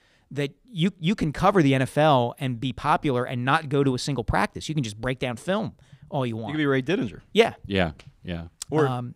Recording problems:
none

